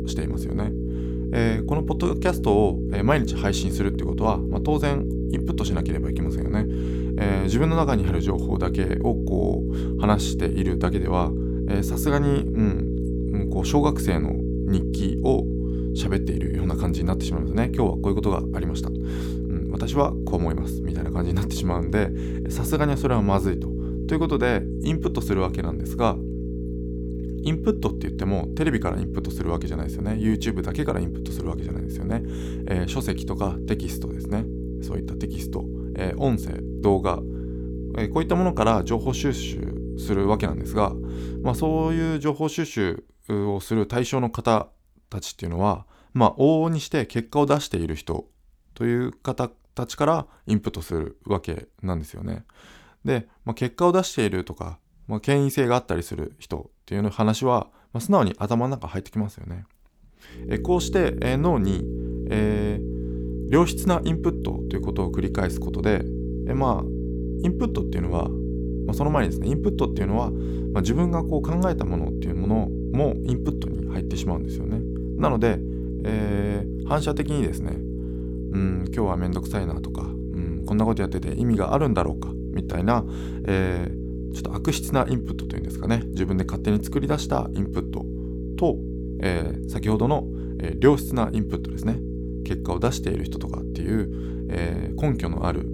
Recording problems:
electrical hum; loud; until 42 s and from 1:00 on; 60 Hz, 8 dB below the speech

